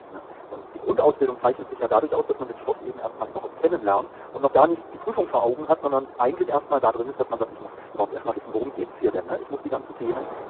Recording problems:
phone-call audio; poor line; nothing above 3.5 kHz
wrong speed, natural pitch; too fast; 1.5 times normal speed
muffled; very slightly; fading above 2.5 kHz
wind noise on the microphone; occasional gusts; 15 dB below the speech

